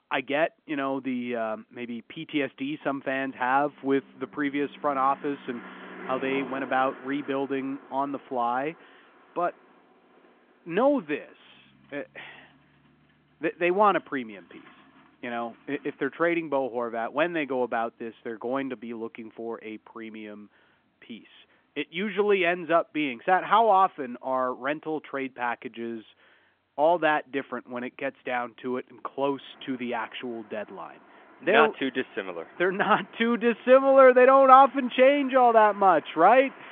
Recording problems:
phone-call audio; nothing above 3.5 kHz
traffic noise; faint; throughout; 25 dB below the speech

